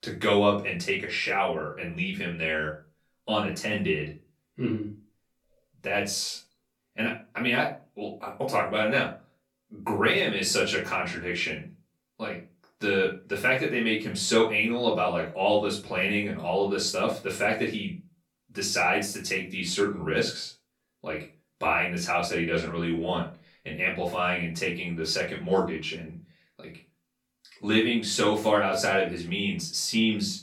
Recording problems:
off-mic speech; far
room echo; slight; dies away in 0.3 s

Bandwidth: 17.5 kHz